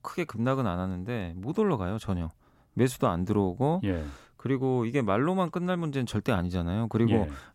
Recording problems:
none

